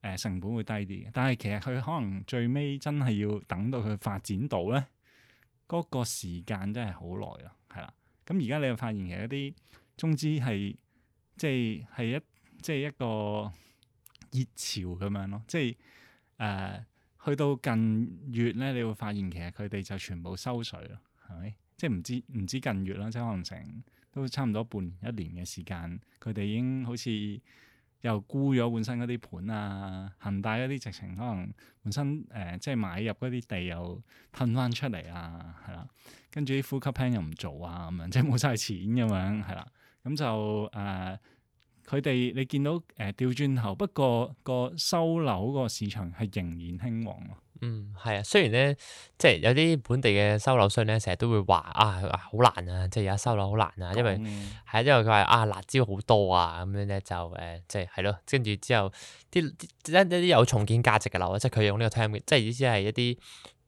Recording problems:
none

